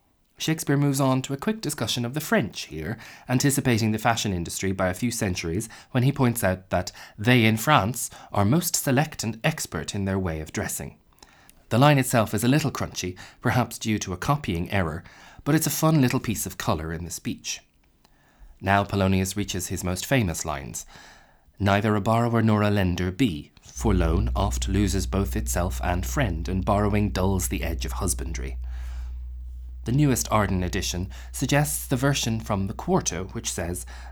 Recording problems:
background music; noticeable; throughout; 10 dB below the speech

